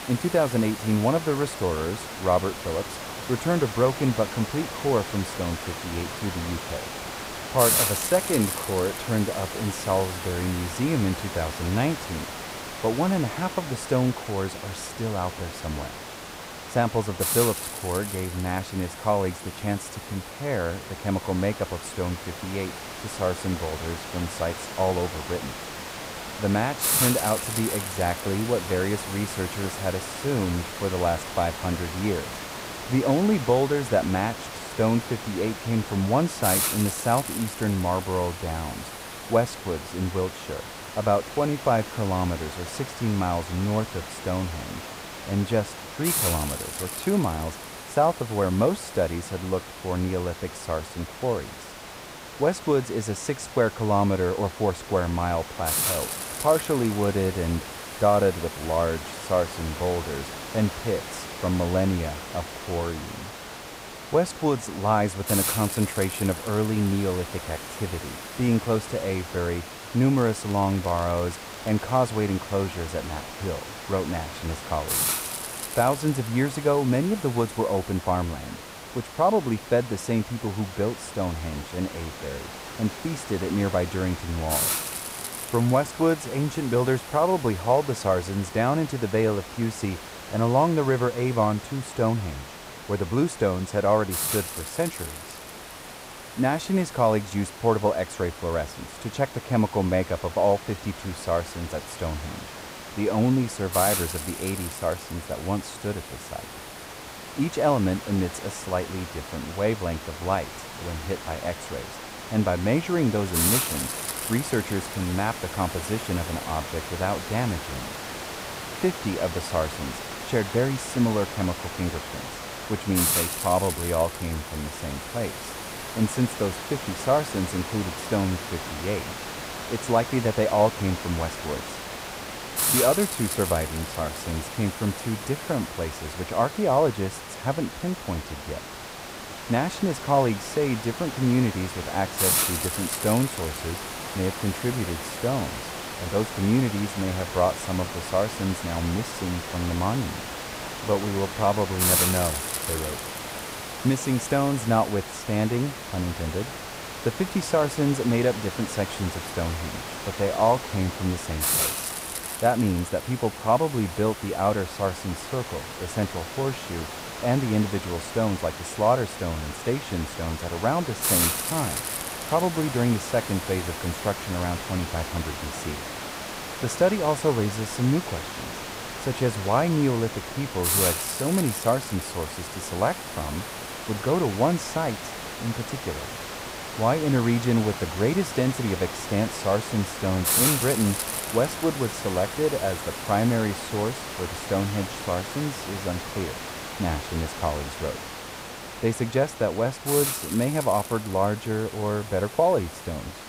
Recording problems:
muffled; slightly; fading above 1.5 kHz
hiss; loud; throughout; 5 dB below the speech
crackling; noticeable; from 1:10 to 1:12; 20 dB below the speech

